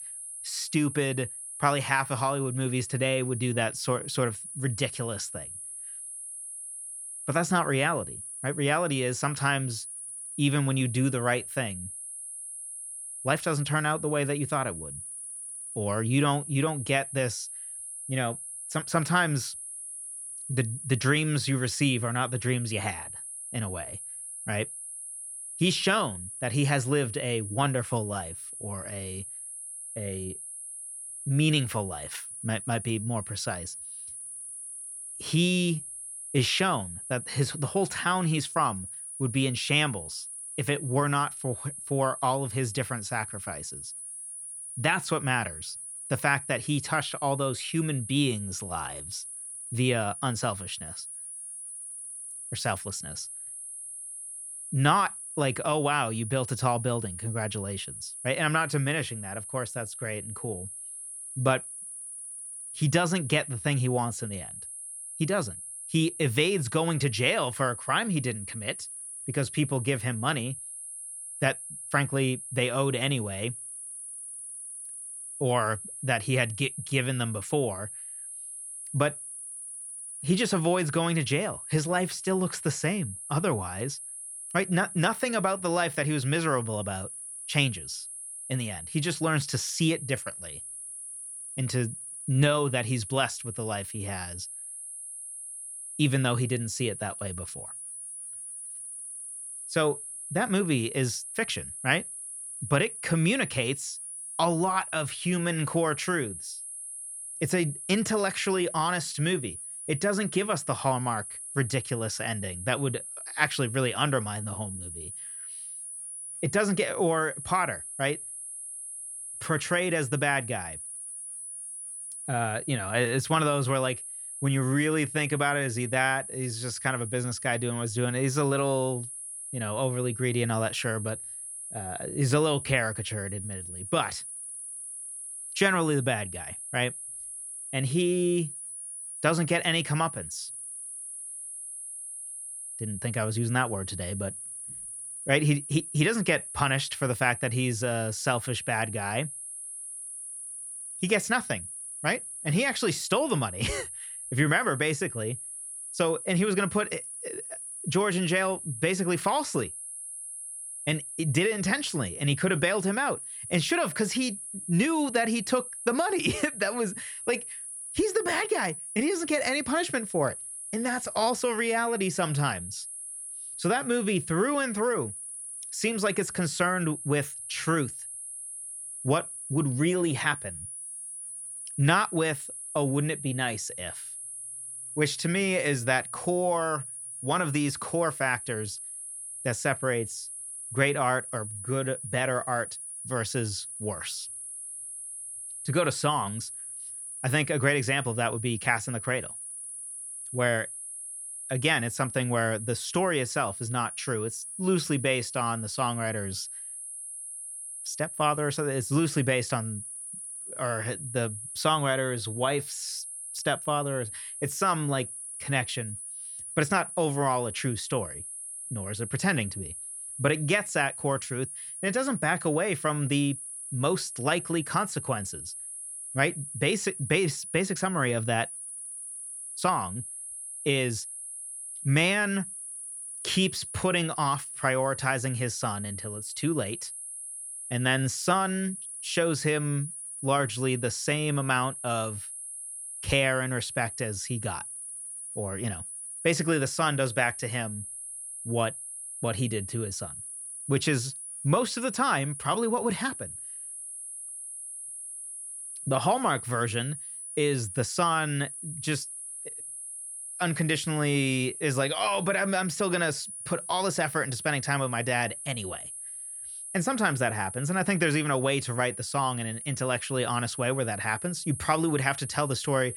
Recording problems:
high-pitched whine; loud; throughout; 10.5 kHz, 8 dB below the speech

